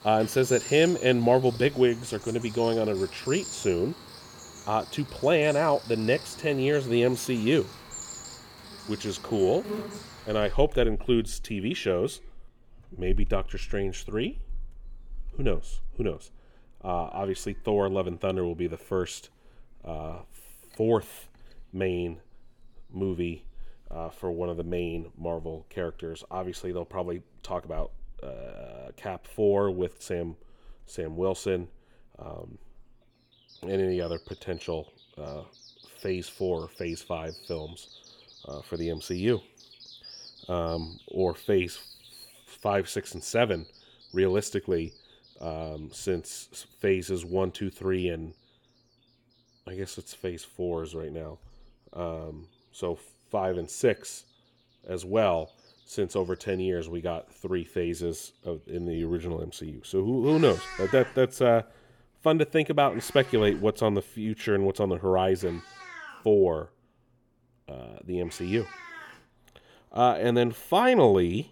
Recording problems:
animal sounds; noticeable; throughout; 15 dB below the speech

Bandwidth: 18 kHz